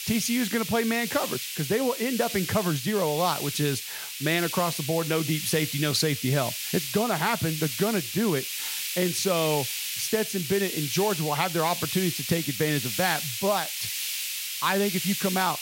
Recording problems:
hiss; loud; throughout; 4 dB below the speech

